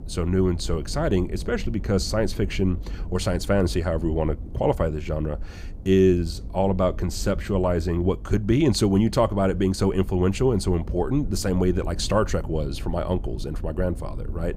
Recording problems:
low rumble; faint; throughout; 20 dB below the speech

